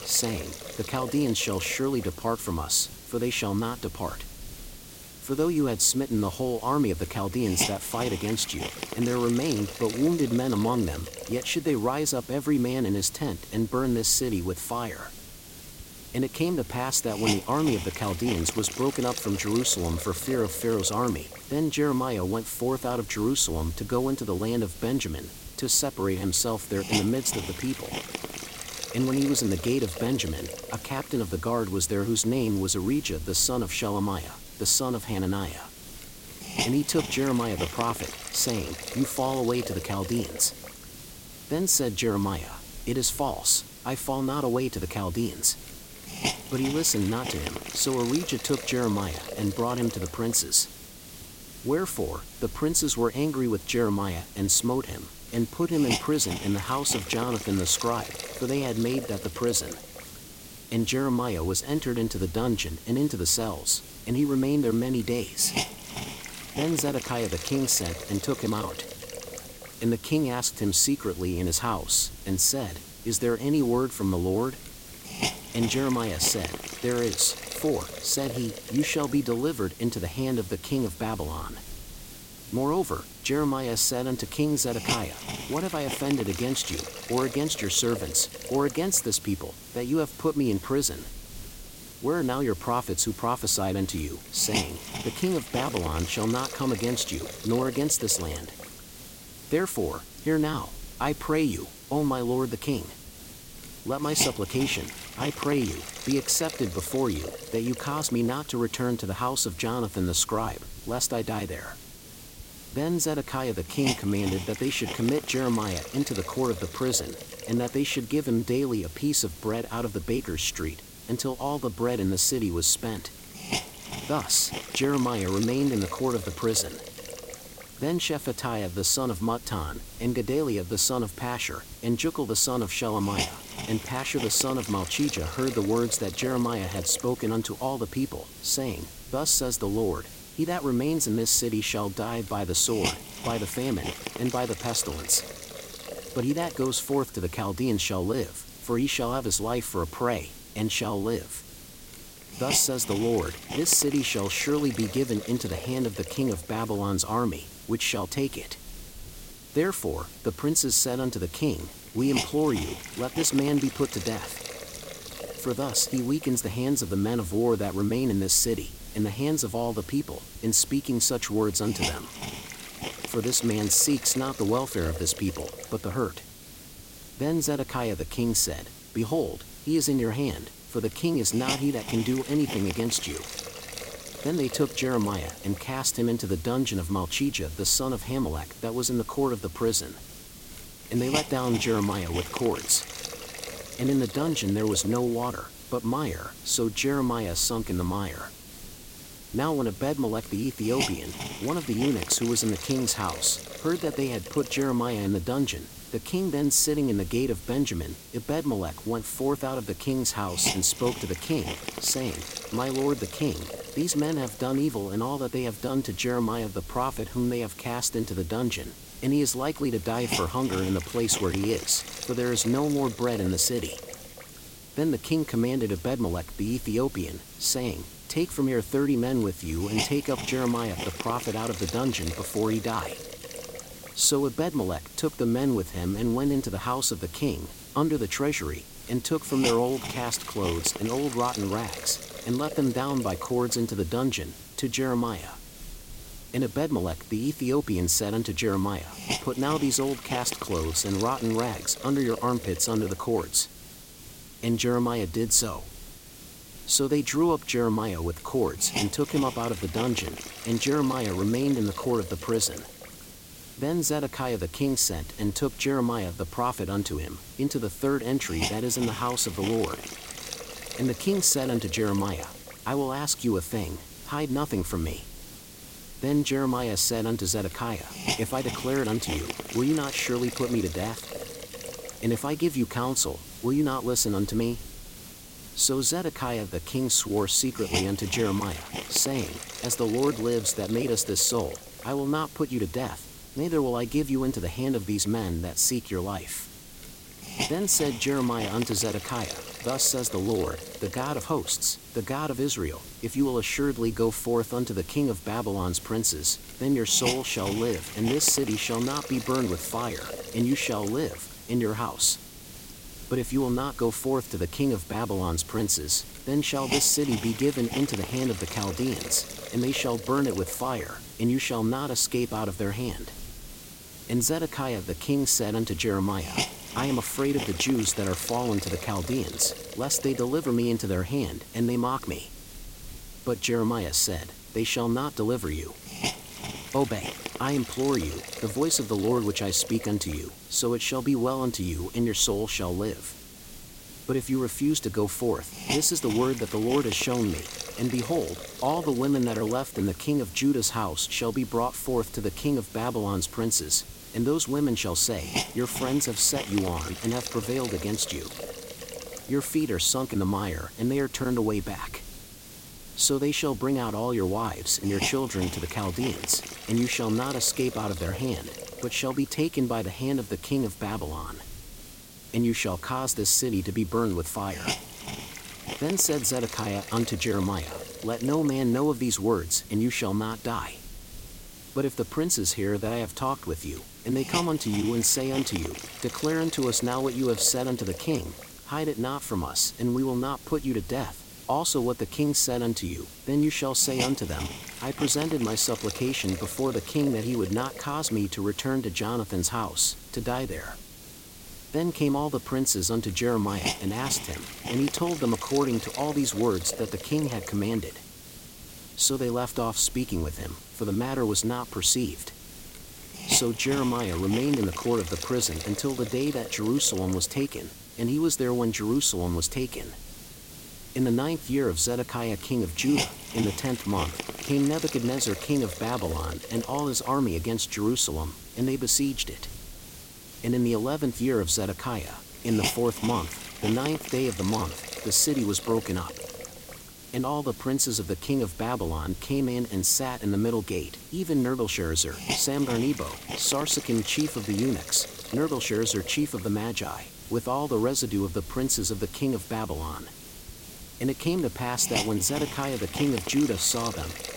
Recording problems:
hiss; noticeable; throughout; 10 dB below the speech

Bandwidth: 16.5 kHz